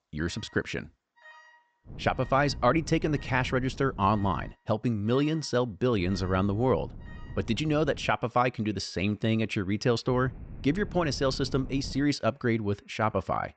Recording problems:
high frequencies cut off; noticeable; nothing above 8 kHz
wind noise on the microphone; occasional gusts; from 2 to 4.5 s, from 6 to 8 s and from 10 to 12 s; 25 dB below the speech
alarms or sirens; faint; throughout; 30 dB below the speech

